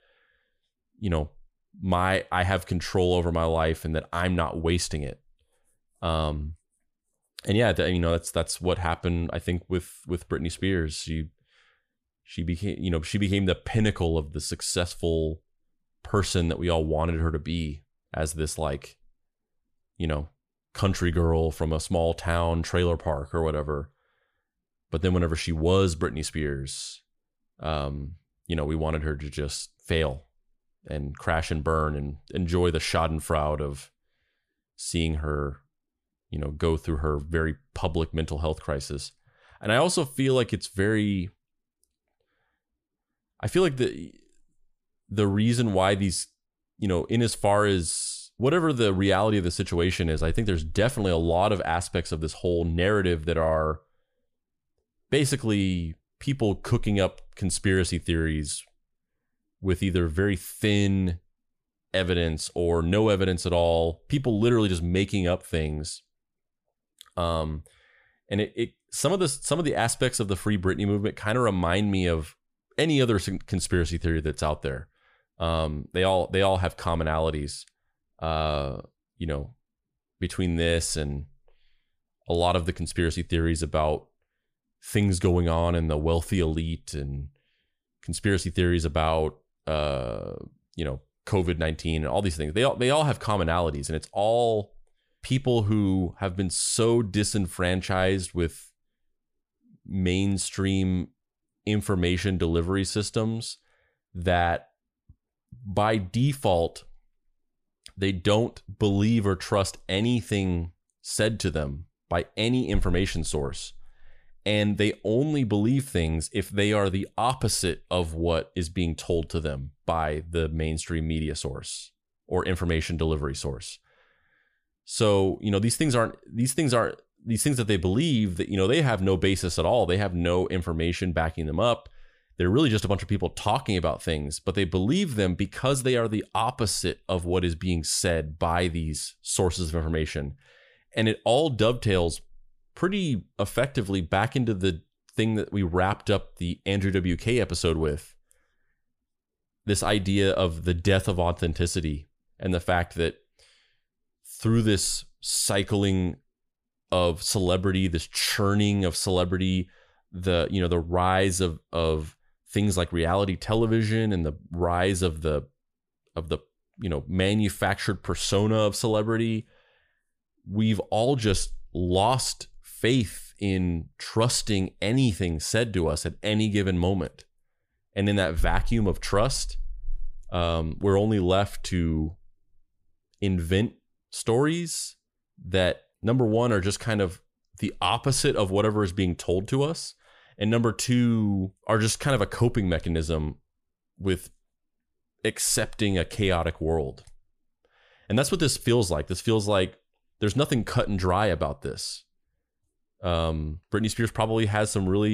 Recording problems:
abrupt cut into speech; at the end

